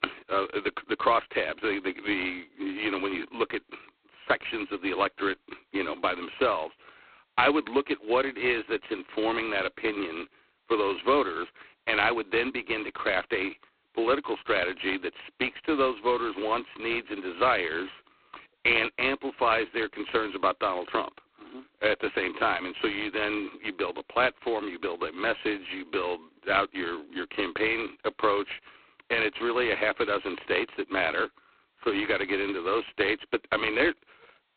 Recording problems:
phone-call audio; poor line; nothing above 4 kHz

